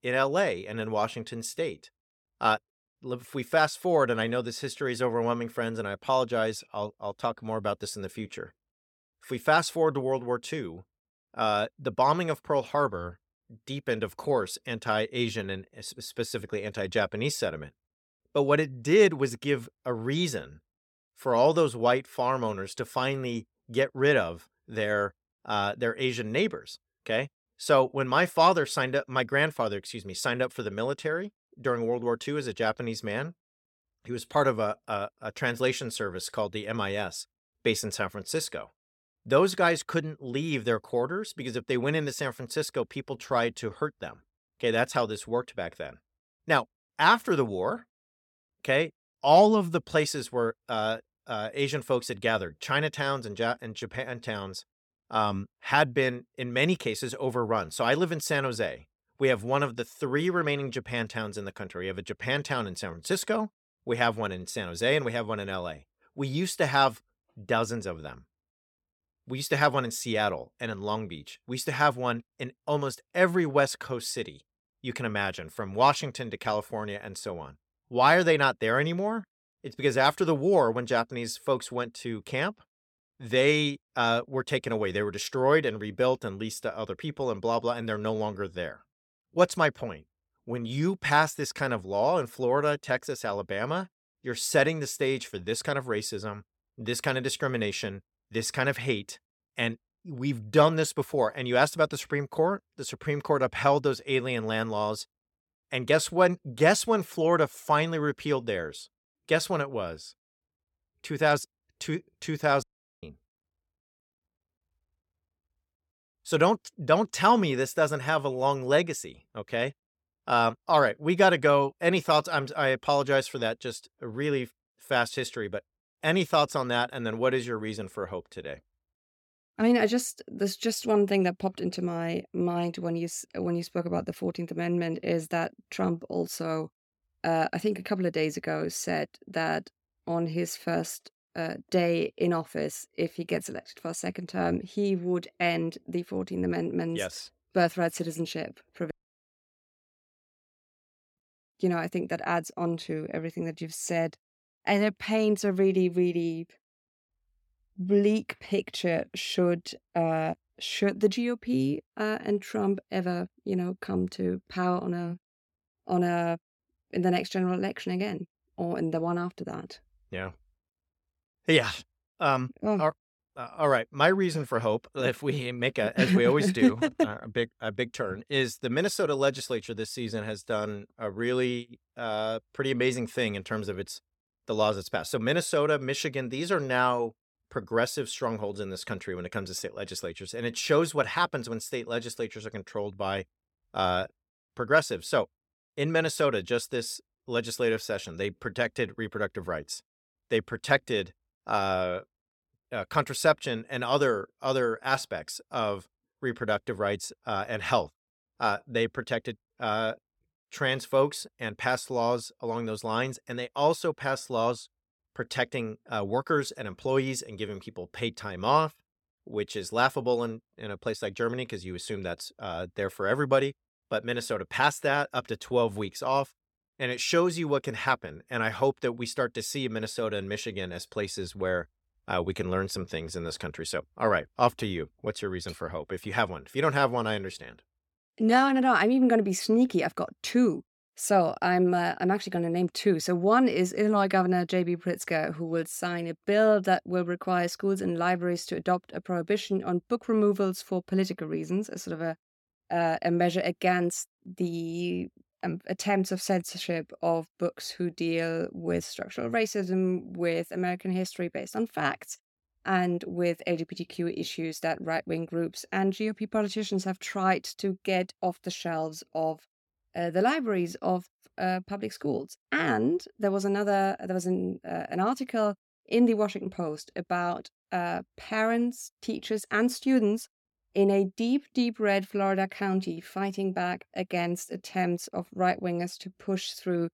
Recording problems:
audio cutting out; at 1:53 and at 2:29 for 2.5 s

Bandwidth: 17 kHz